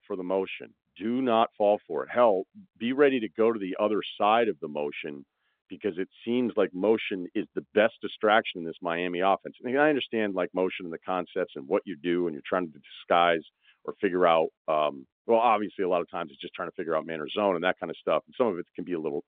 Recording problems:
phone-call audio; nothing above 3.5 kHz

